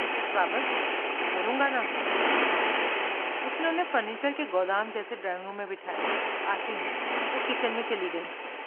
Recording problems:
phone-call audio; nothing above 3 kHz
traffic noise; very loud; throughout; 3 dB above the speech

